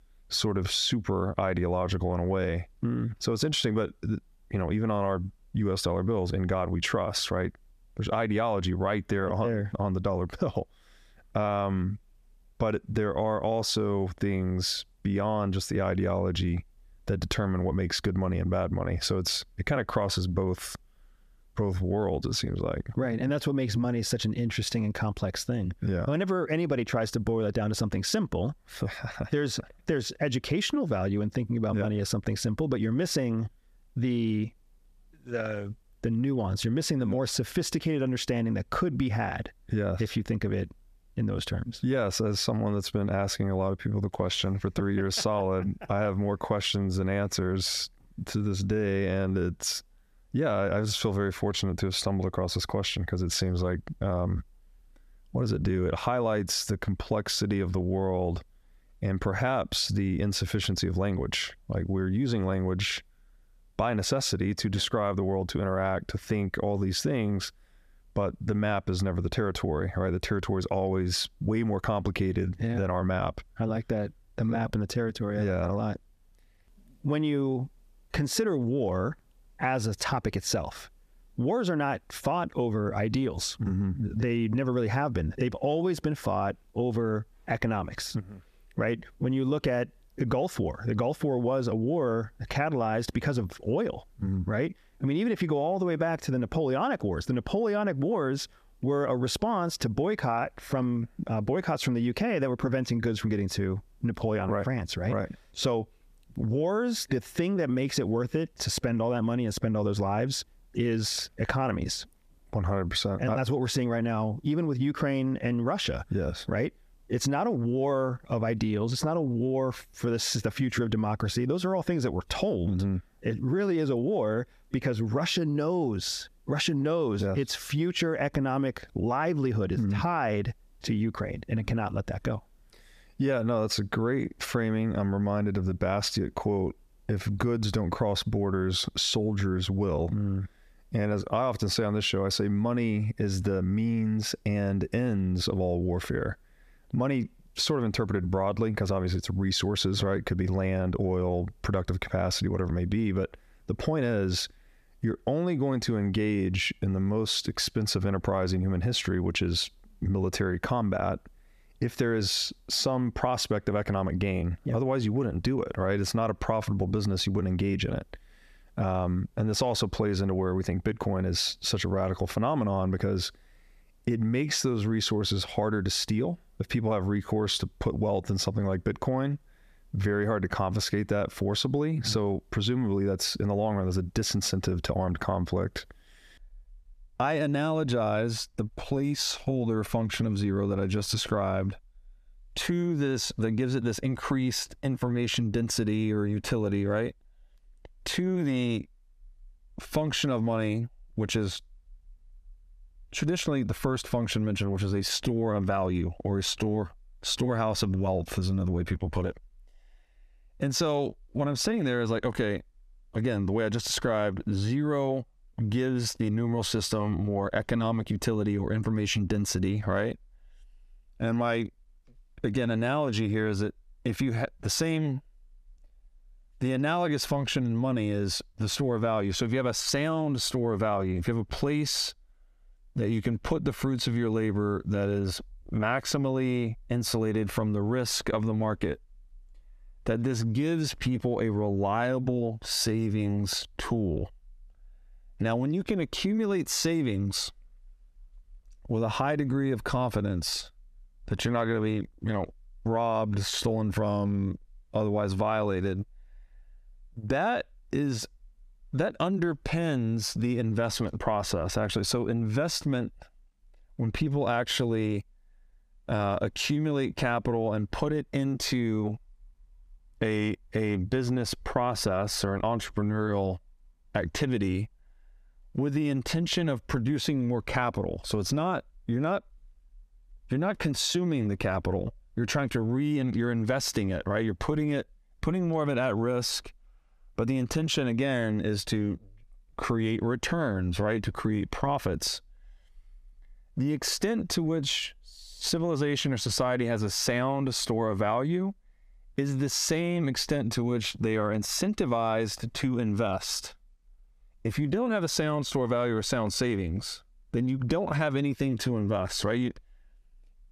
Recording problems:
squashed, flat; heavily

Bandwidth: 14.5 kHz